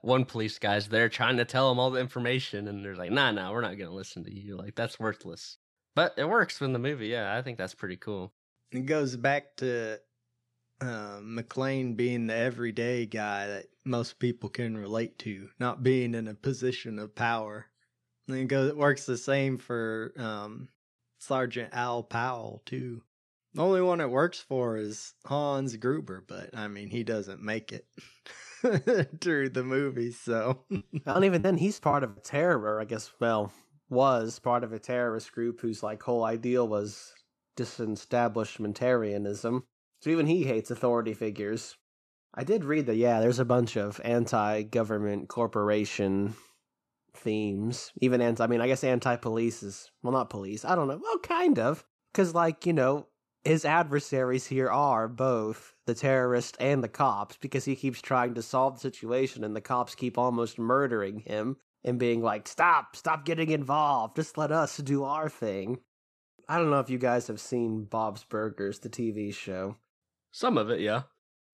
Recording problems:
choppy; very; from 31 to 32 s; 14% of the speech affected

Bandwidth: 14 kHz